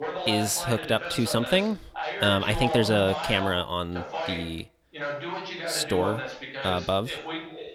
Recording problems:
voice in the background; loud; throughout; 7 dB below the speech

